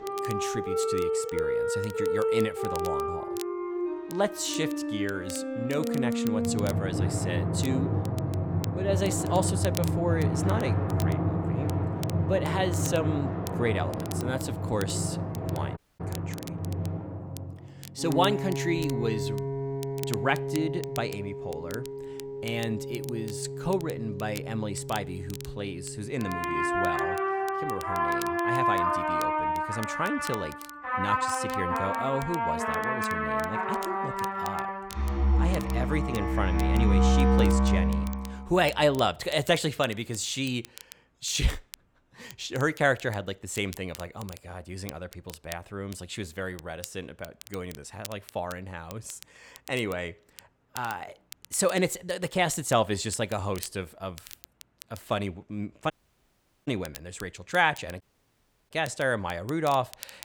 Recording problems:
background music; very loud; until 38 s; 2 dB above the speech
crackle, like an old record; noticeable; 15 dB below the speech
audio cutting out; at 16 s, at 56 s for 1 s and at 58 s for 0.5 s

